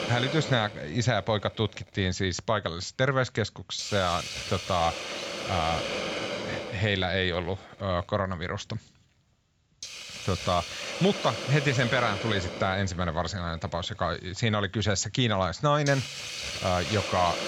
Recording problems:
high frequencies cut off; noticeable; nothing above 7.5 kHz
hiss; loud; throughout; 6 dB below the speech

